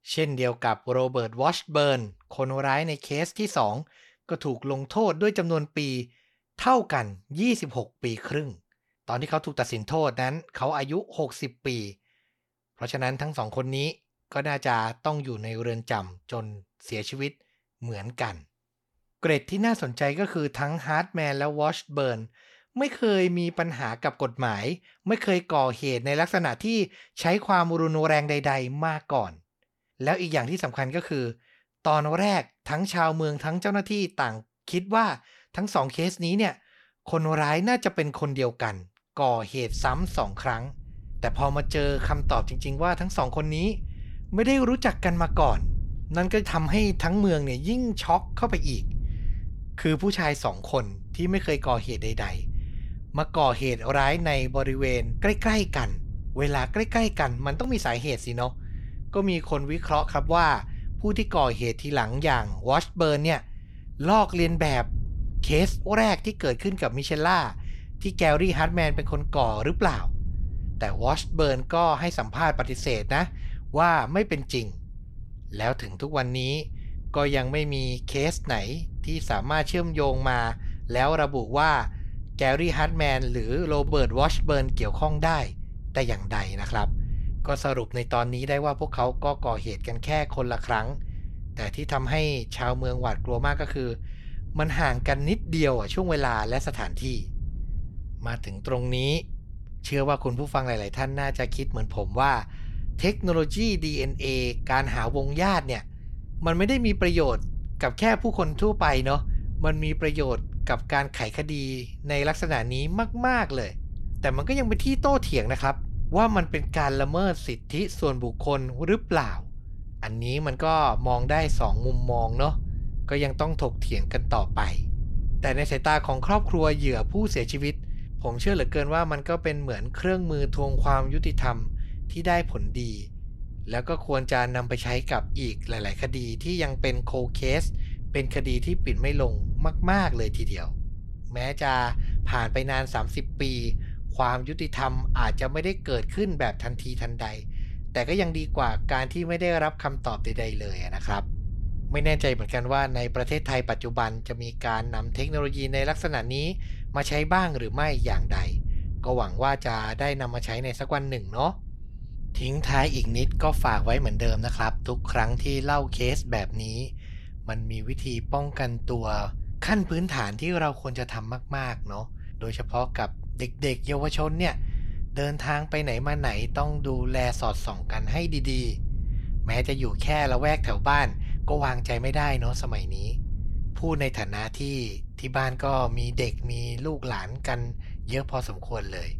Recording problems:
low rumble; faint; from 40 s on; 25 dB below the speech

